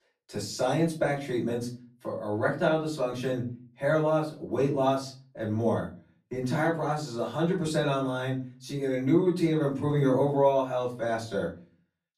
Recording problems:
off-mic speech; far
room echo; slight; dies away in 0.3 s

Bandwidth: 14.5 kHz